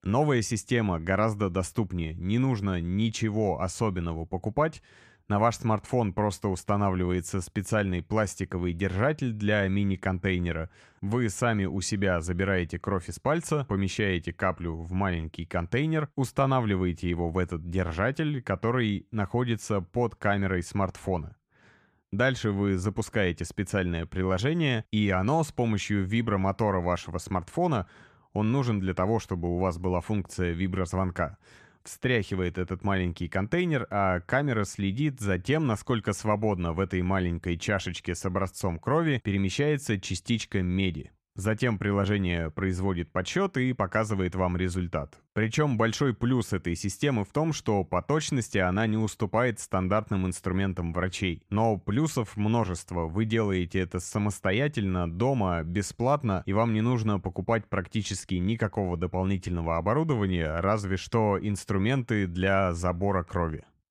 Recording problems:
none

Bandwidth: 14.5 kHz